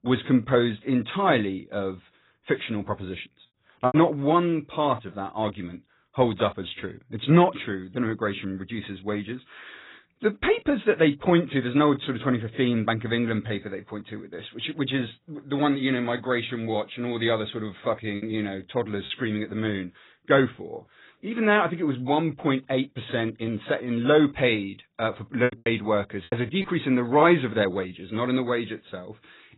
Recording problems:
garbled, watery; badly; nothing above 4 kHz
choppy; very; at 4 s, at 18 s and from 25 to 27 s; 8% of the speech affected

